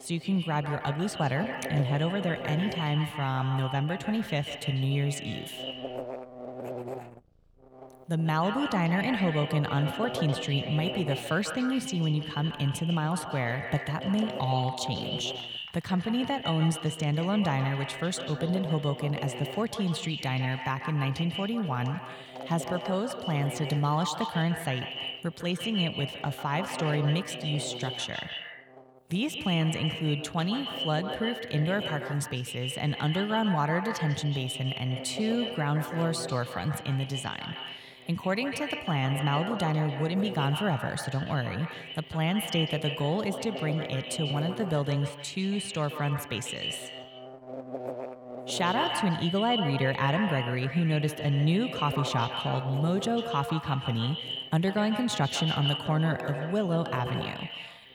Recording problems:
echo of what is said; strong; throughout; 140 ms later, 7 dB below the speech
electrical hum; loud; throughout; 60 Hz, 10 dB below the speech
animal sounds; faint; throughout; 30 dB below the speech

